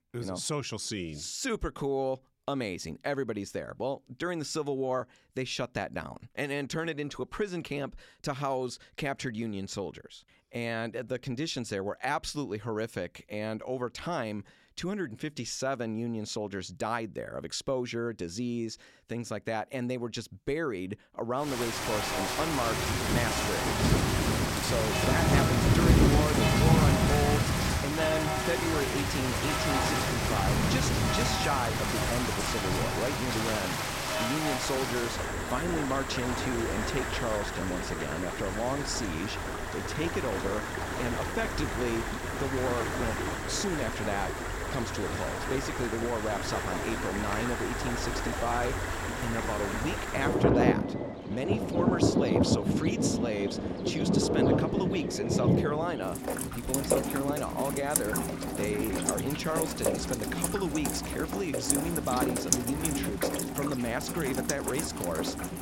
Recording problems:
rain or running water; very loud; from 21 s on; 4 dB above the speech

